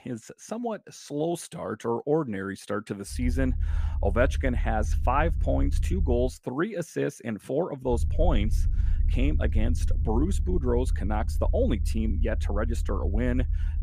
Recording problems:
low rumble; noticeable; from 3 to 6.5 s and from 8 s on; 15 dB below the speech

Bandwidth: 15 kHz